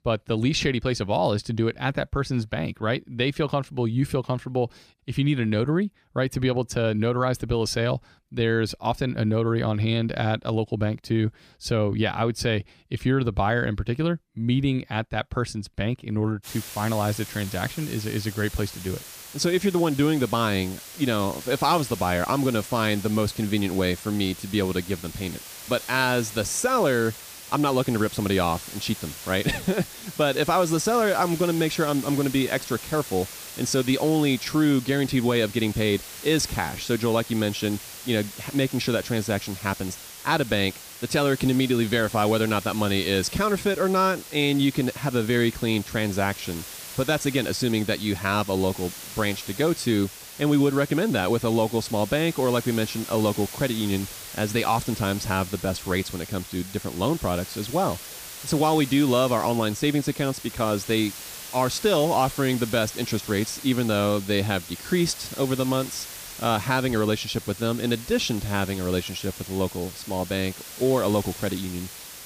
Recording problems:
hiss; noticeable; from 16 s on; 10 dB below the speech

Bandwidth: 15 kHz